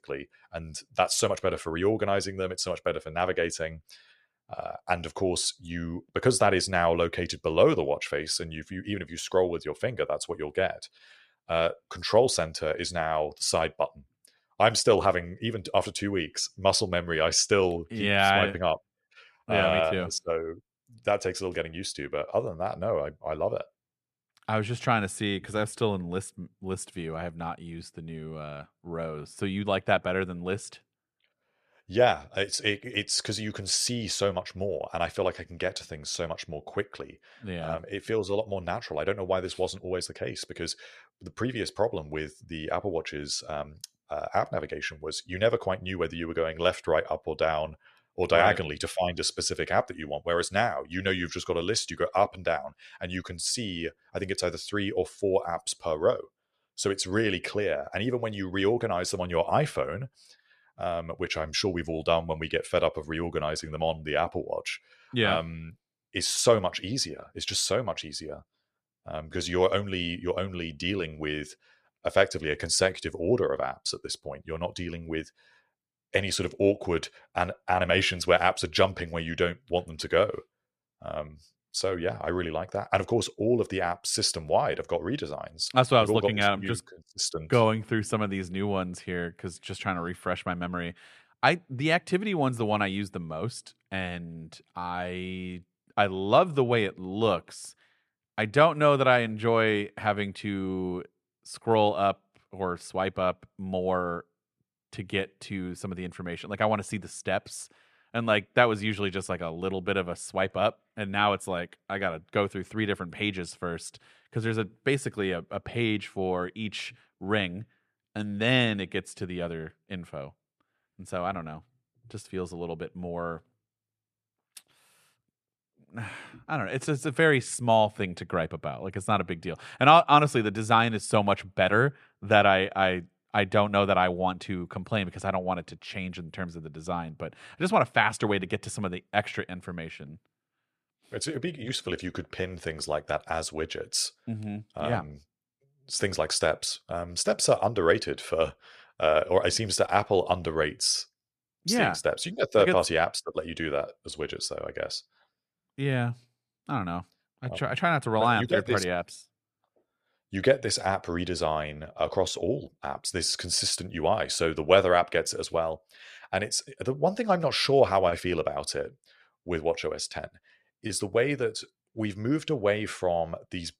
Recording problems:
none

